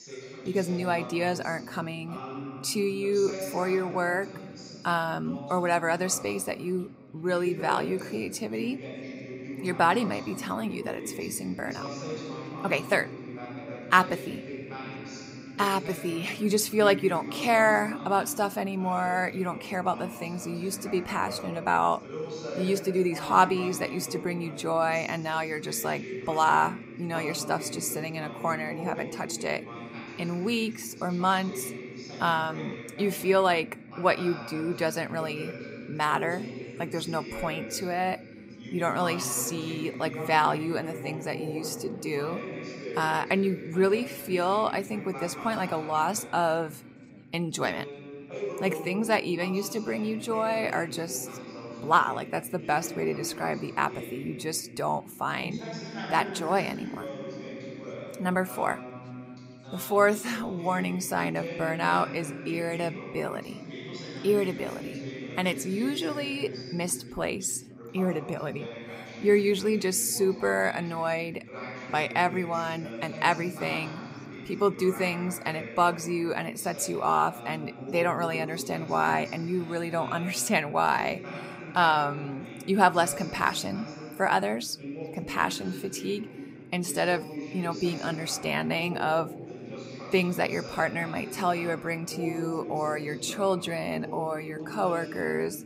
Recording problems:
background chatter; noticeable; throughout; 3 voices, 10 dB below the speech

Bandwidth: 15.5 kHz